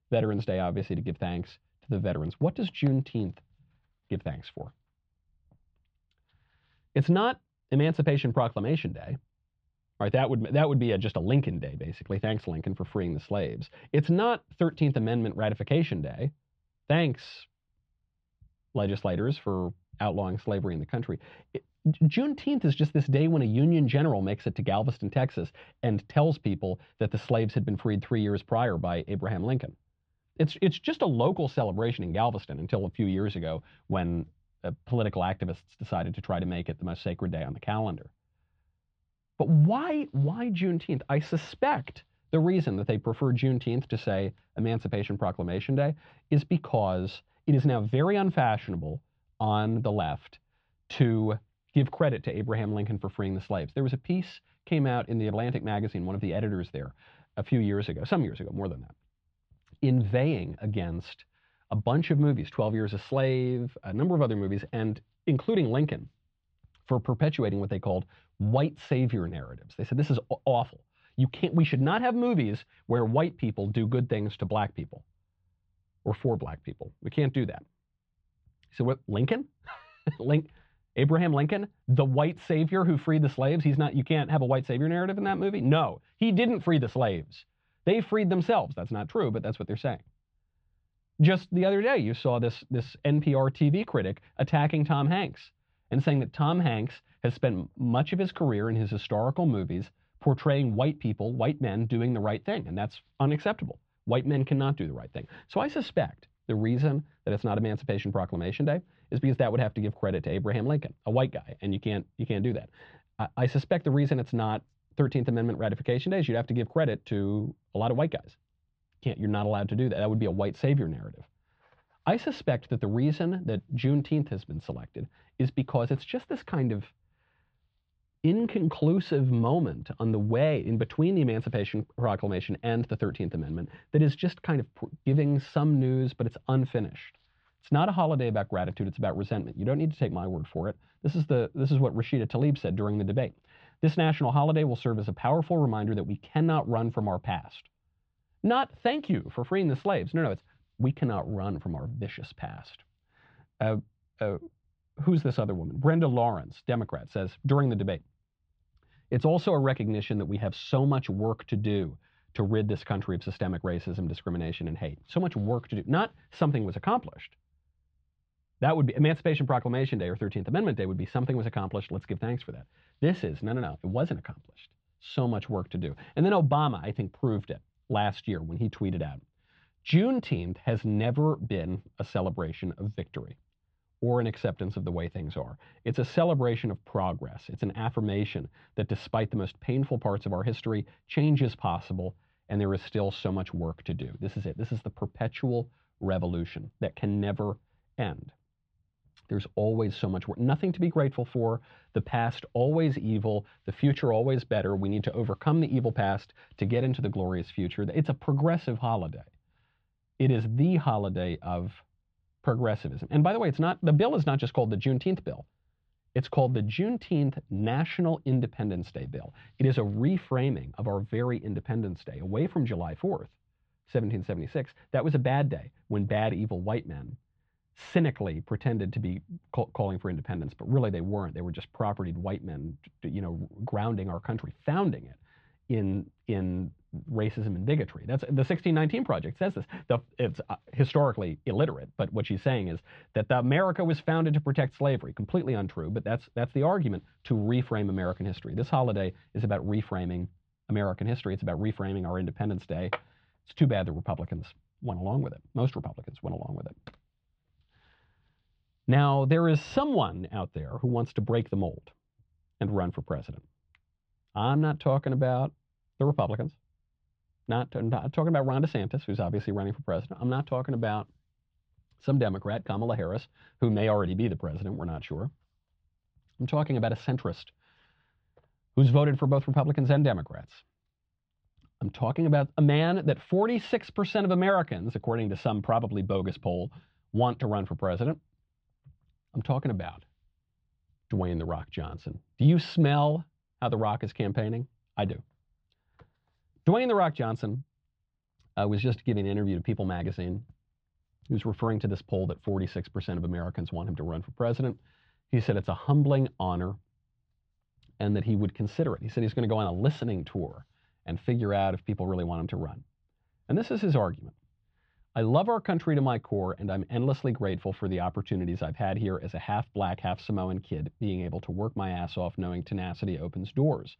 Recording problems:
muffled; slightly; fading above 3.5 kHz

